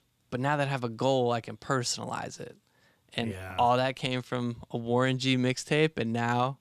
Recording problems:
none

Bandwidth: 14.5 kHz